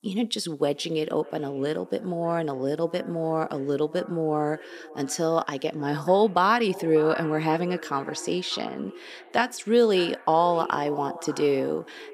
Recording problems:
echo of what is said; noticeable; throughout; 590 ms later, 15 dB below the speech

